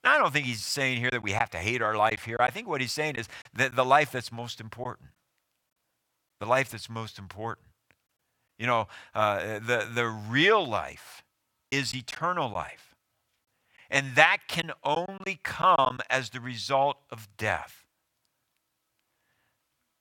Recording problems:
choppy; occasionally; from 1 to 3.5 s and from 12 to 16 s; 5% of the speech affected

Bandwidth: 17 kHz